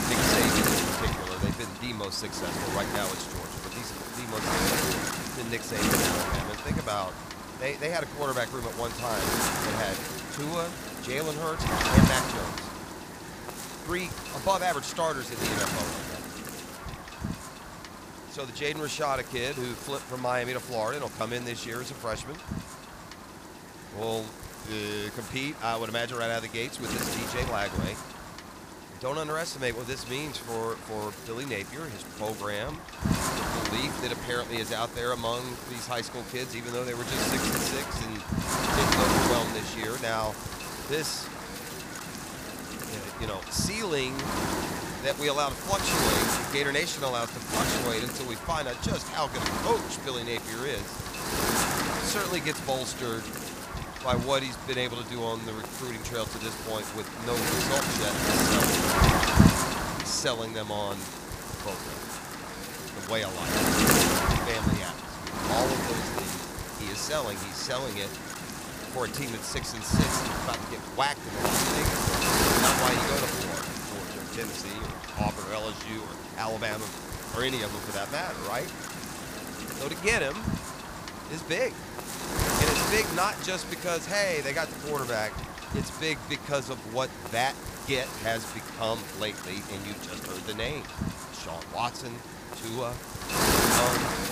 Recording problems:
wind noise on the microphone; heavy; 1 dB above the speech

